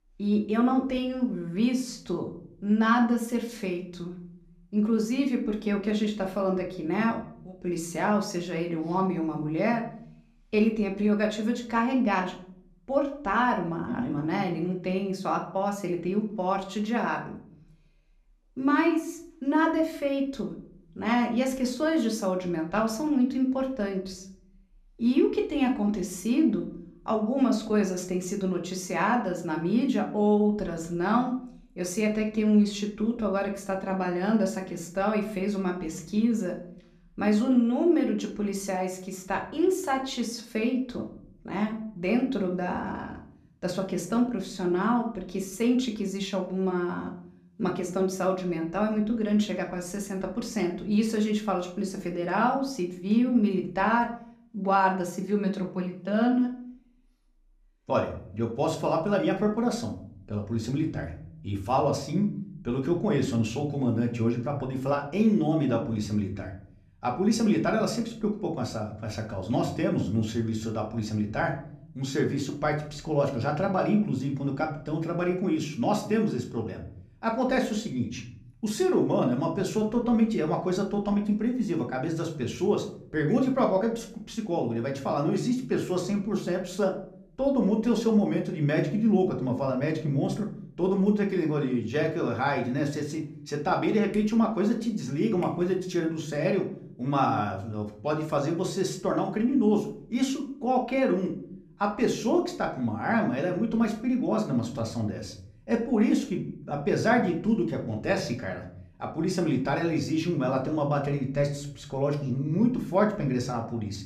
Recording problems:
room echo; slight; dies away in 0.6 s
off-mic speech; somewhat distant

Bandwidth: 14.5 kHz